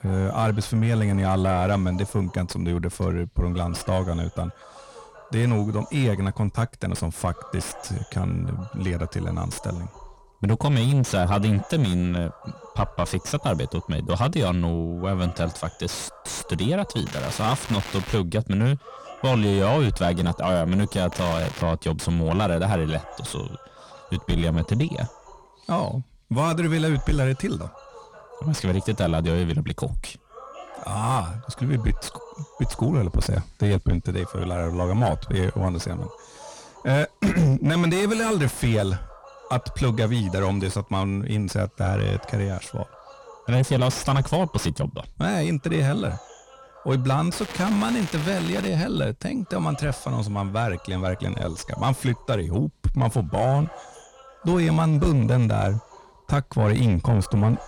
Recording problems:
distortion; heavy; 7 dB below the speech
crackling; noticeable; from 17 to 18 s, at 21 s and from 47 to 49 s; 10 dB below the speech
voice in the background; faint; throughout; 20 dB below the speech

